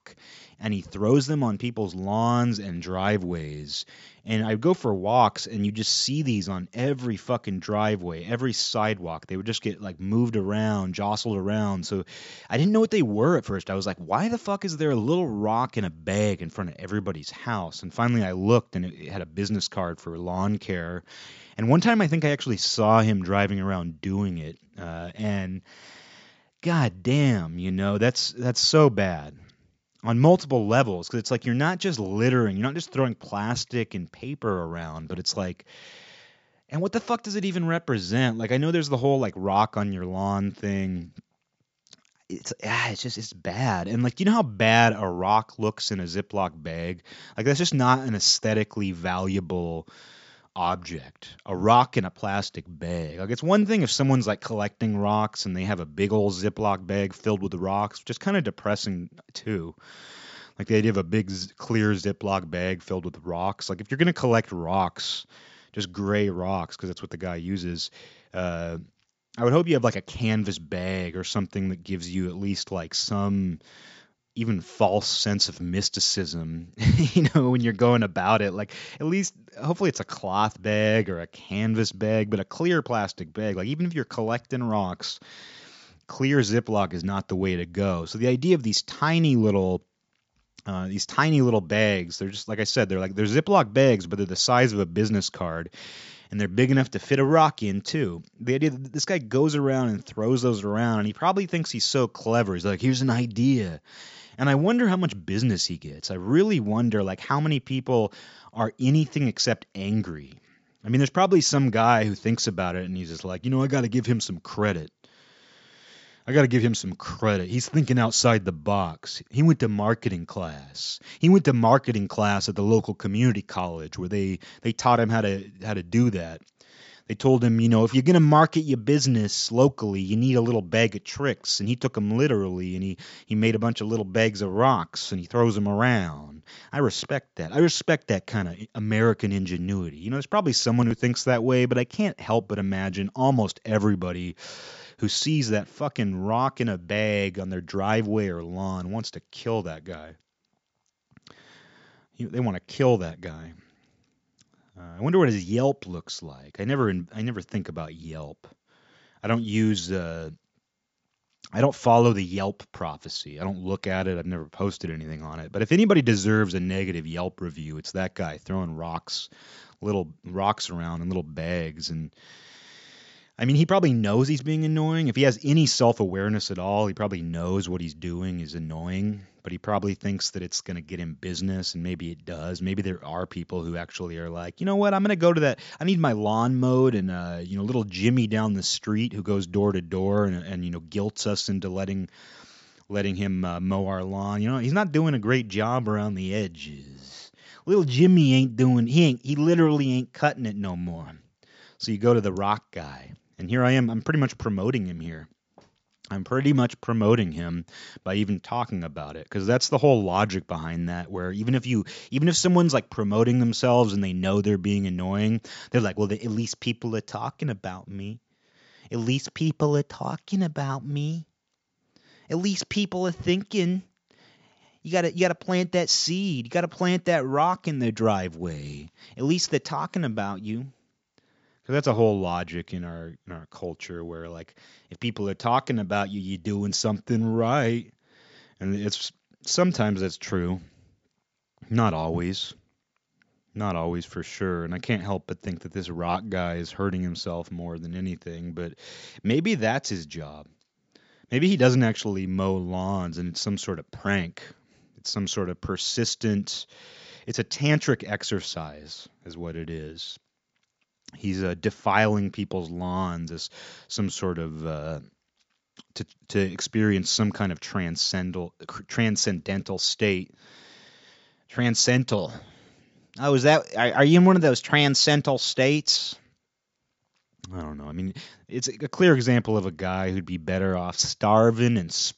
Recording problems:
high frequencies cut off; noticeable; nothing above 7.5 kHz

